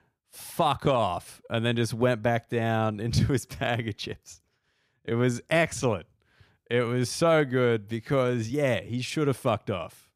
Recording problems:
uneven, jittery; strongly; from 1 to 8.5 s

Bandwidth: 15 kHz